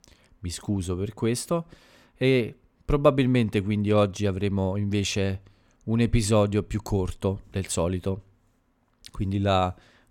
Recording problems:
none

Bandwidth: 17 kHz